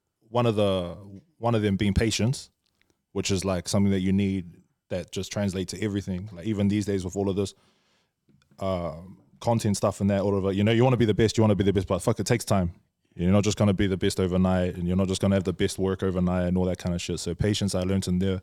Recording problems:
none

